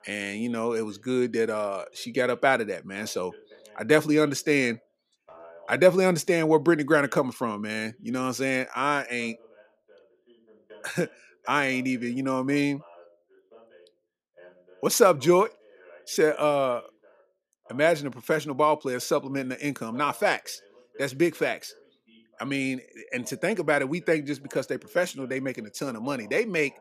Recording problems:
voice in the background; faint; throughout; 25 dB below the speech

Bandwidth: 14.5 kHz